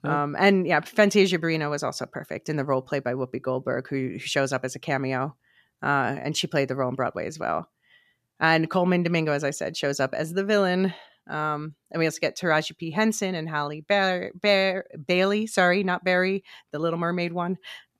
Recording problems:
none

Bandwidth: 14.5 kHz